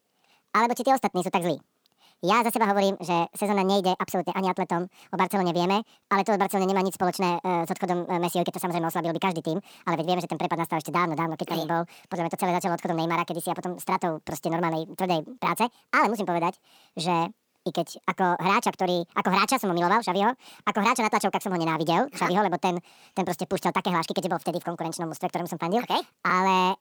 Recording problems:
wrong speed and pitch; too fast and too high; 1.7 times normal speed

